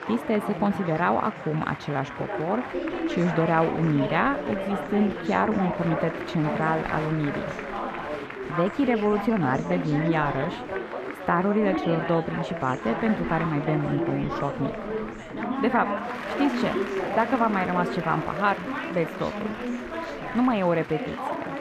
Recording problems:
muffled; slightly; fading above 4 kHz
chatter from many people; loud; throughout; 5 dB below the speech

